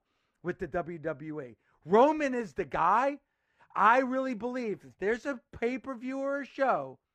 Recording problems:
muffled; slightly; fading above 3.5 kHz

